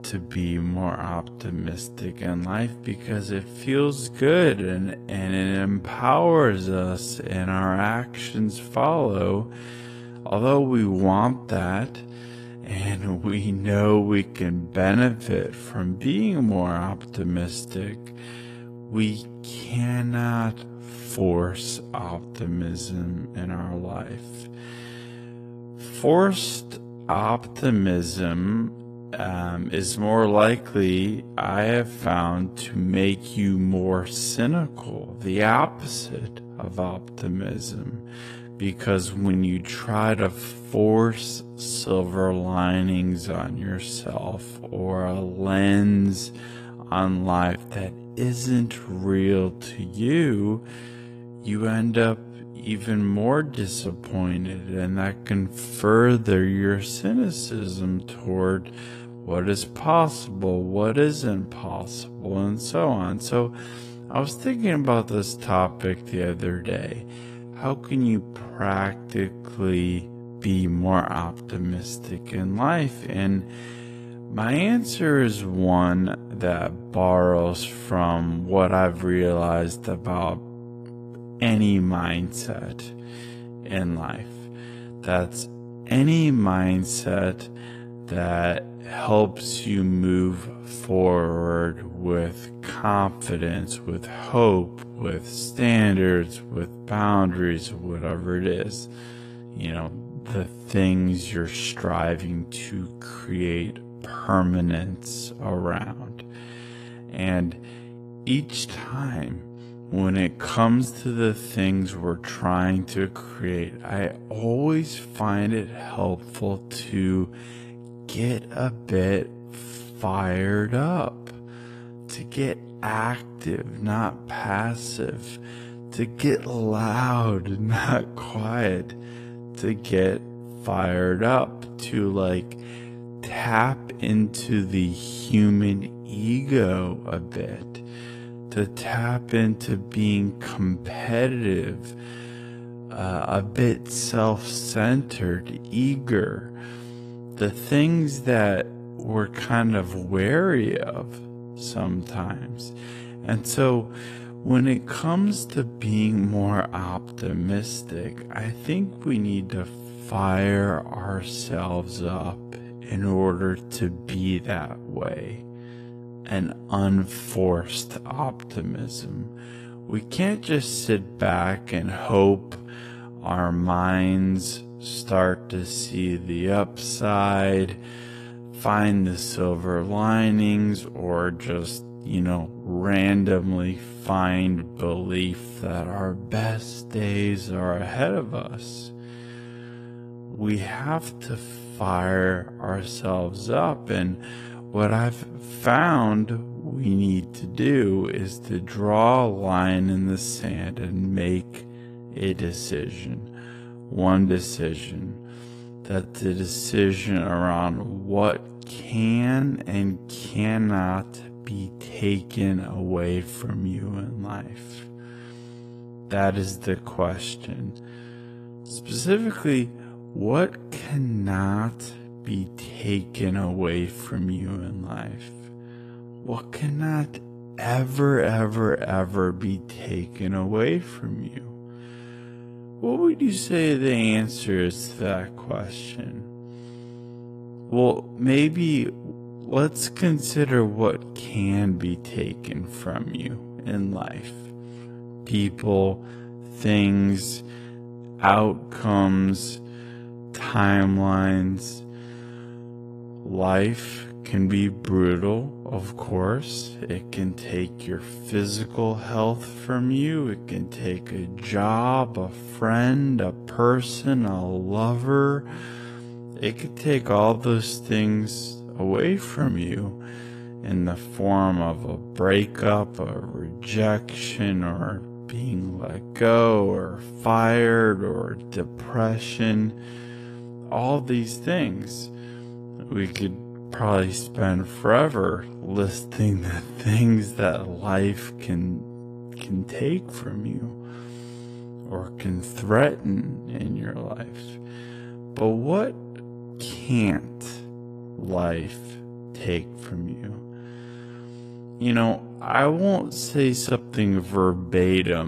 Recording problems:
wrong speed, natural pitch; too slow; 0.5 times normal speed
garbled, watery; slightly; nothing above 14.5 kHz
electrical hum; noticeable; throughout; 60 Hz, 20 dB below the speech
abrupt cut into speech; at the end

